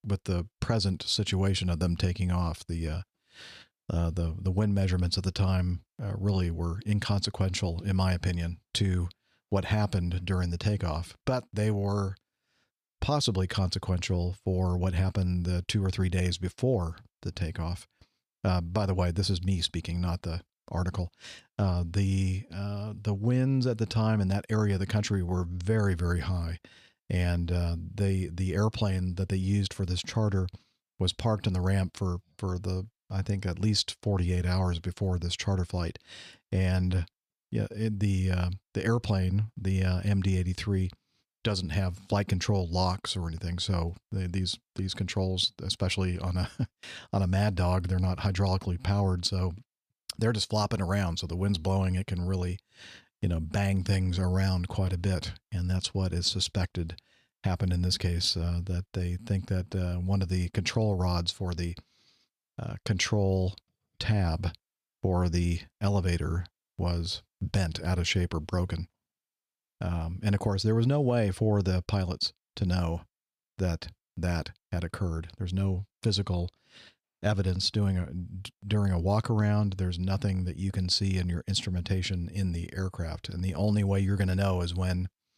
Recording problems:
none

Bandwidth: 14.5 kHz